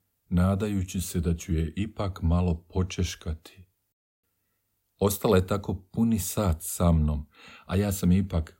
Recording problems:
none

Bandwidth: 16 kHz